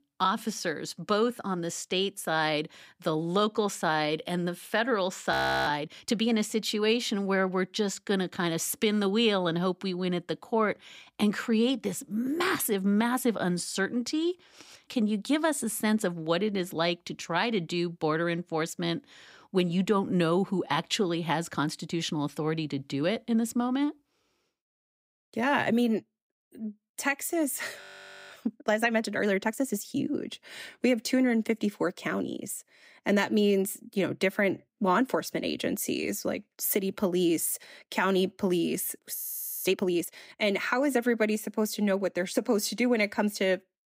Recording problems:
audio freezing; at 5.5 s, at 28 s and at 39 s

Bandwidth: 15.5 kHz